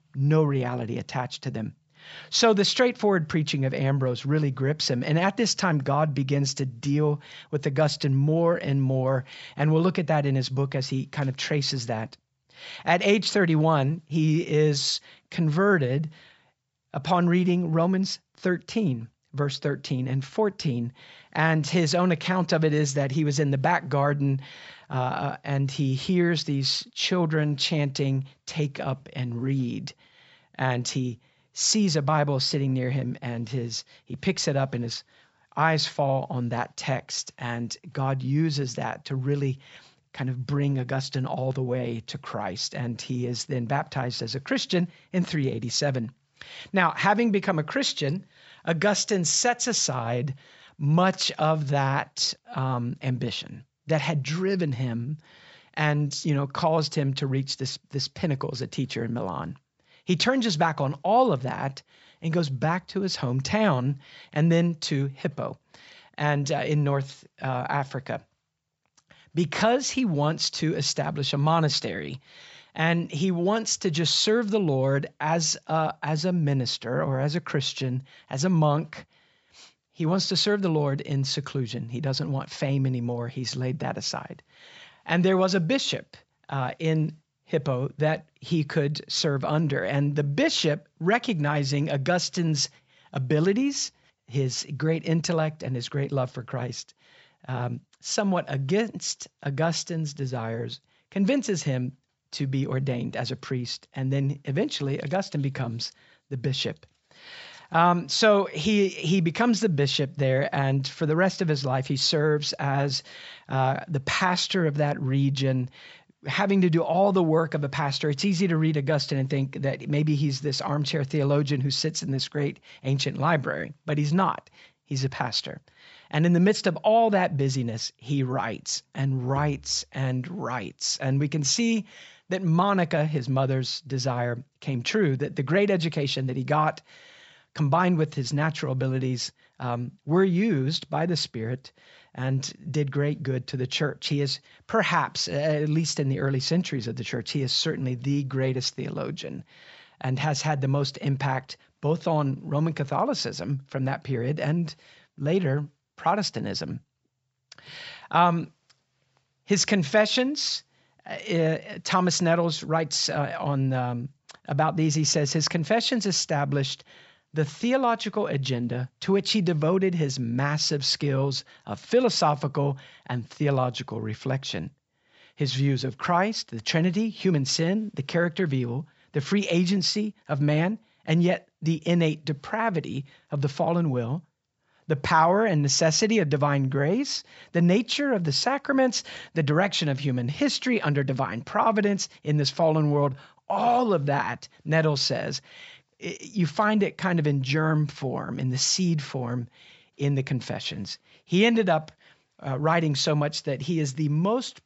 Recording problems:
high frequencies cut off; noticeable; nothing above 7.5 kHz

